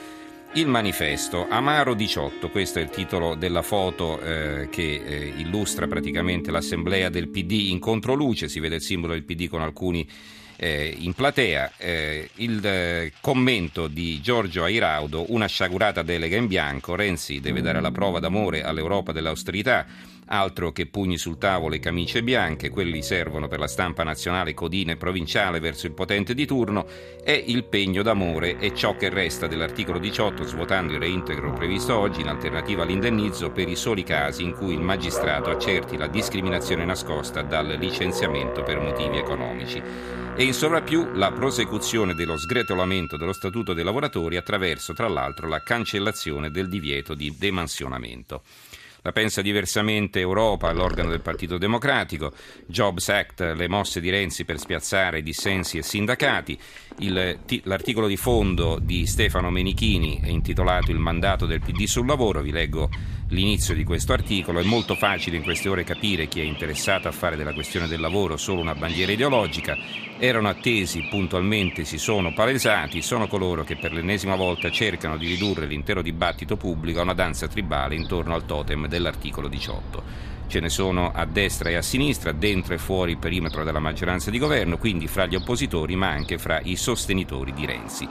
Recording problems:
background music; loud; until 47 s; 9 dB below the speech
animal sounds; loud; from 51 s on; 8 dB below the speech

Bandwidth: 14.5 kHz